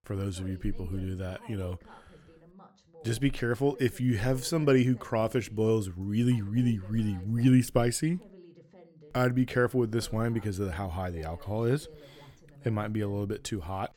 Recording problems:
voice in the background; faint; throughout; 25 dB below the speech

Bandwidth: 17.5 kHz